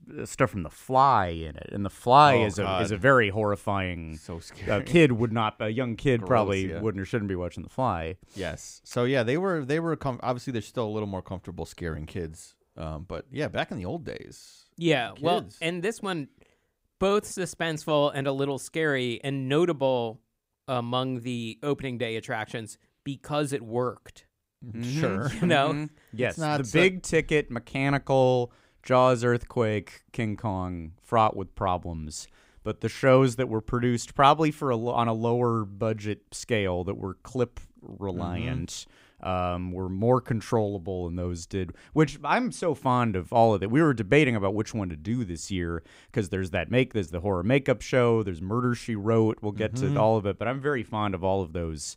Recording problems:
none

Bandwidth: 15.5 kHz